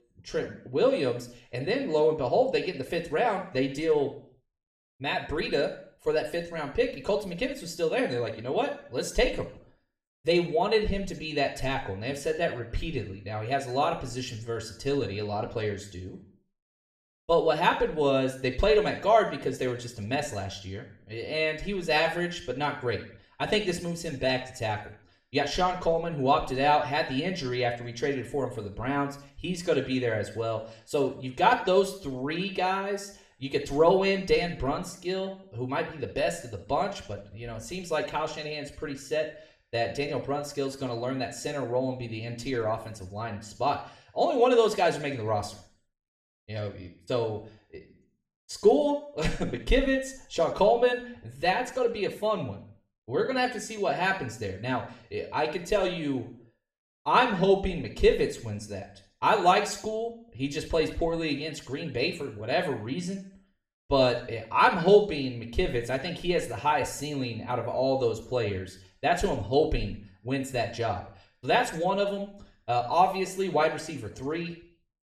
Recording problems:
room echo; slight; dies away in 0.5 s
off-mic speech; somewhat distant

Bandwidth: 14 kHz